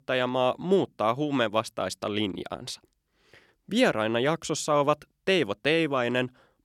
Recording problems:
none

